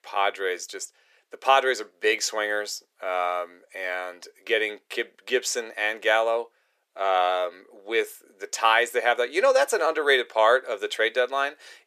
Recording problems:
thin; very; fading below 400 Hz

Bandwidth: 14.5 kHz